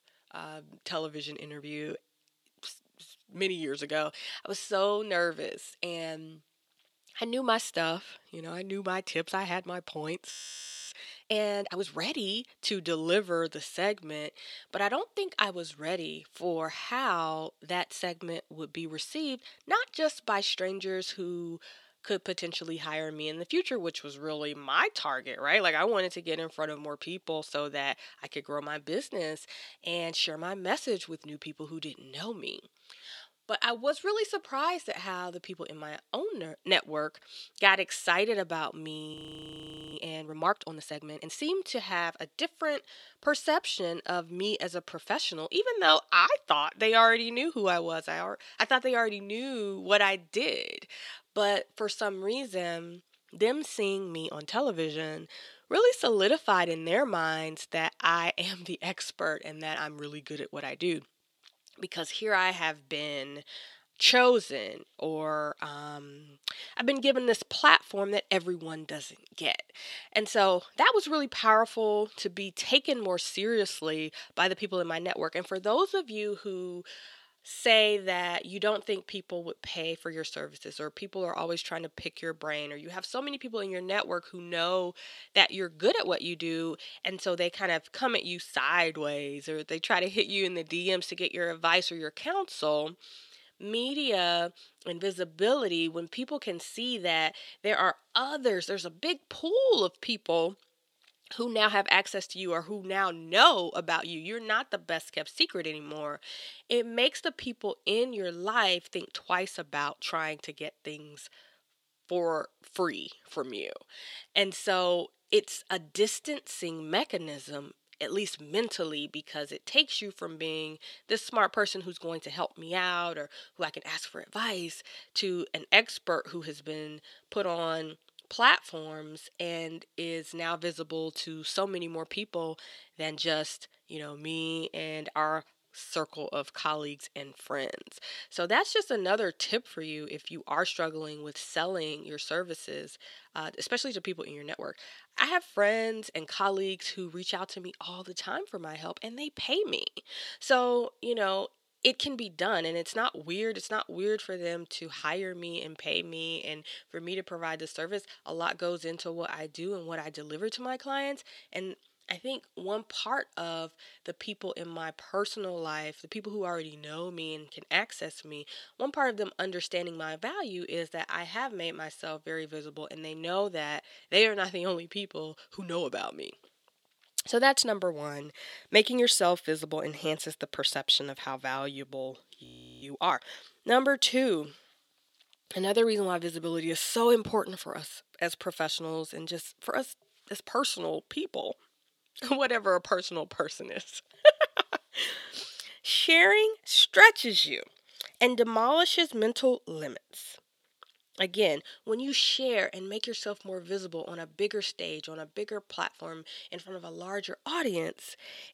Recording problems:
thin; somewhat; fading below 350 Hz
audio freezing; at 10 s for 0.5 s, at 39 s for 1 s and at 3:02

